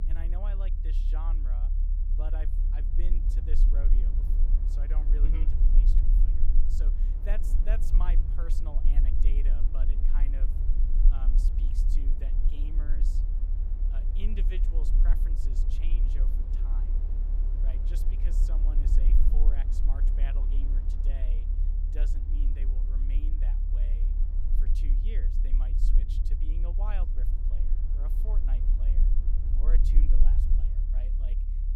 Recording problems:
wind noise on the microphone; heavy; 10 dB below the speech
low rumble; loud; throughout; 3 dB below the speech

